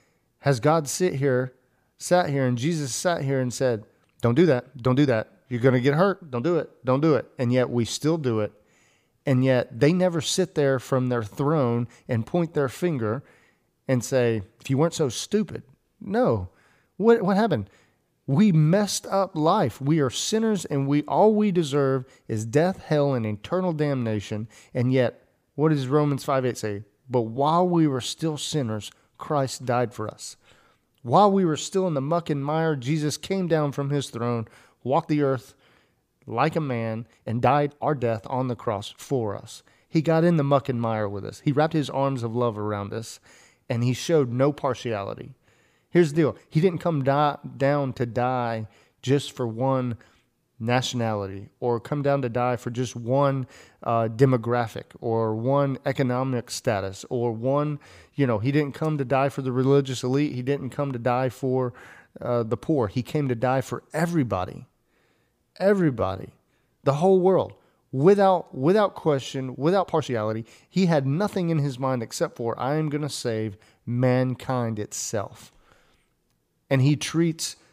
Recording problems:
uneven, jittery; strongly; from 4 s to 1:11

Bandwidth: 15 kHz